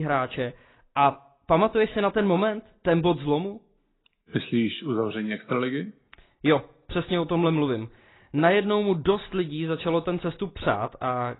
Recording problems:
garbled, watery; badly; nothing above 4 kHz
abrupt cut into speech; at the start

